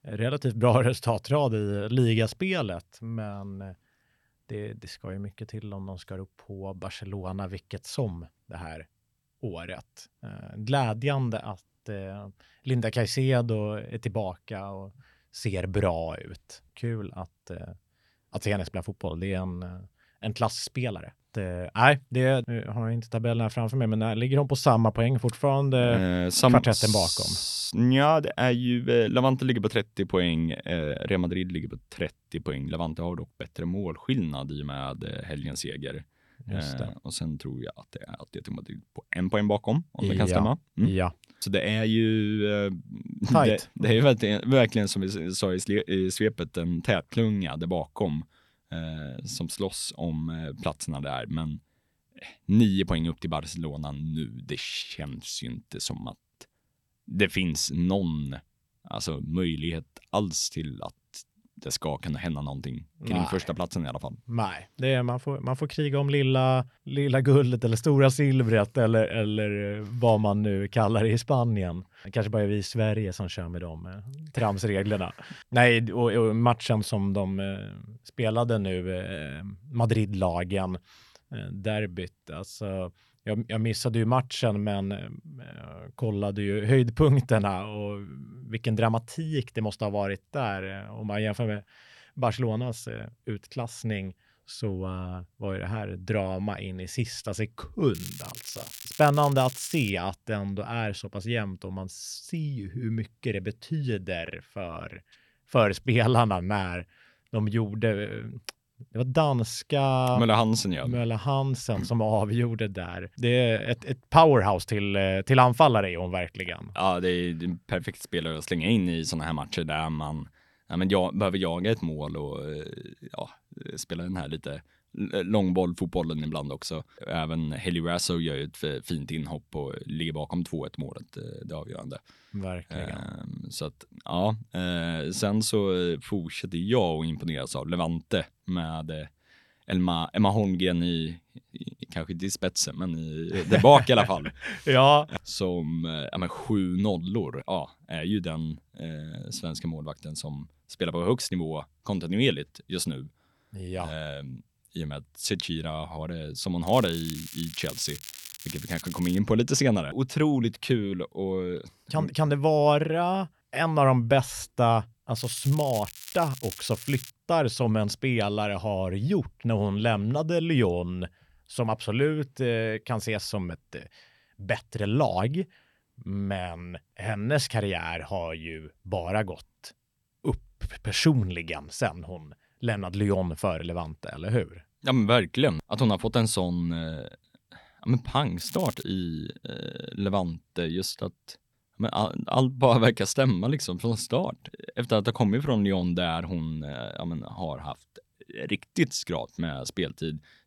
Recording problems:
crackling; noticeable; 4 times, first at 1:38; 15 dB below the speech

